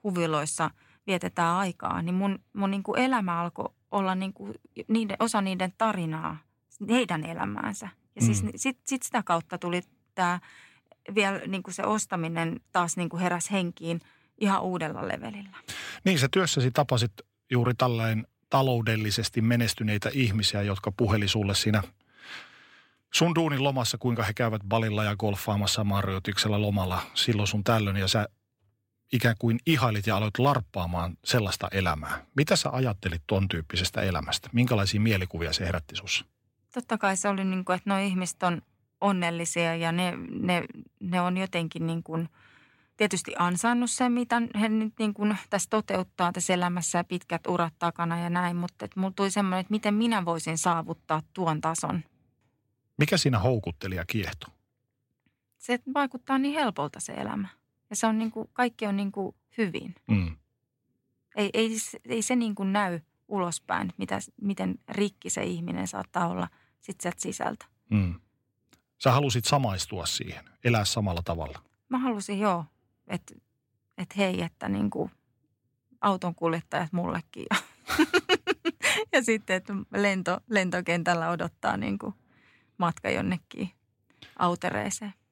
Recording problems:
none

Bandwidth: 16 kHz